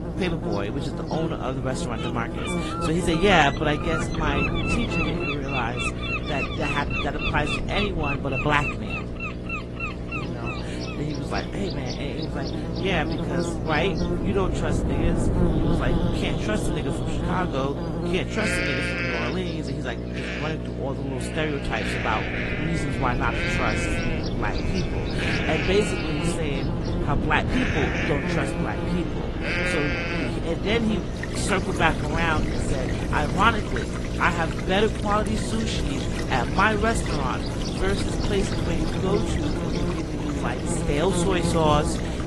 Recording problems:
garbled, watery; slightly
electrical hum; loud; throughout; 60 Hz, 8 dB below the speech
animal sounds; loud; throughout; 4 dB below the speech
rain or running water; noticeable; throughout; 15 dB below the speech
wind noise on the microphone; occasional gusts; until 17 s and from 22 s on; 10 dB below the speech

